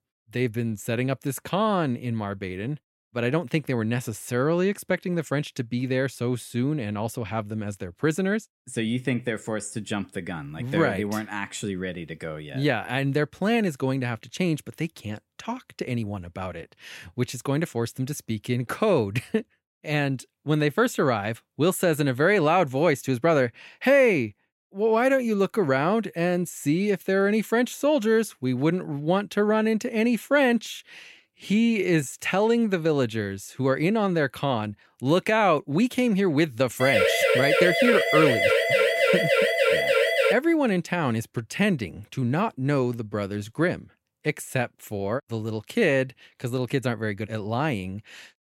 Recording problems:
uneven, jittery; strongly; from 8 to 44 s
siren; loud; from 37 to 40 s; peak 5 dB above the speech

